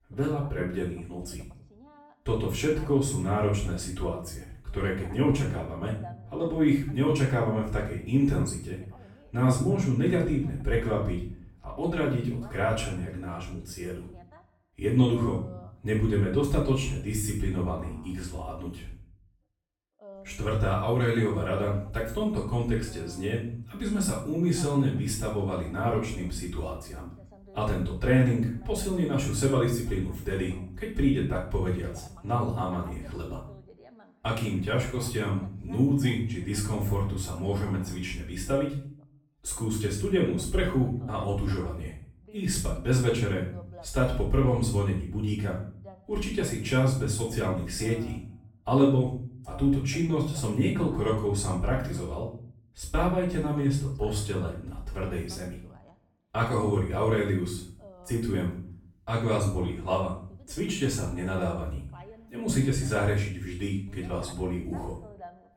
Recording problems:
off-mic speech; far
room echo; noticeable; dies away in 0.5 s
voice in the background; faint; throughout; 25 dB below the speech

